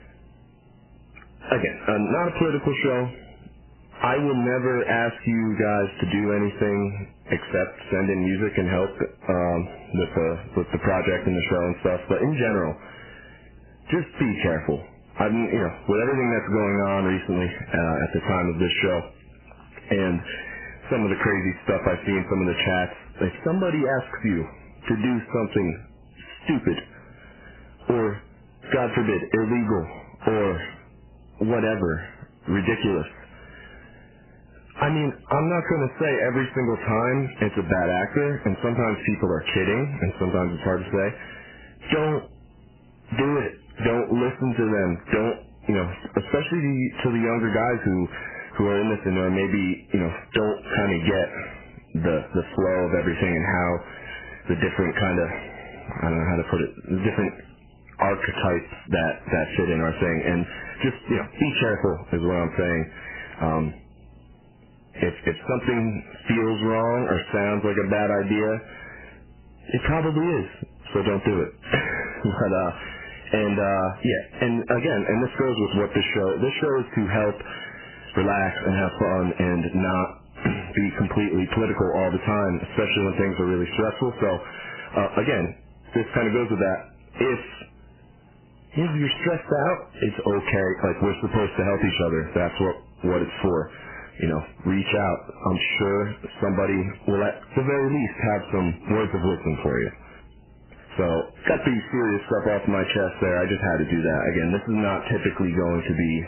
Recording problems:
distortion; heavy; 10% of the sound clipped
garbled, watery; badly; nothing above 3 kHz
squashed, flat; somewhat

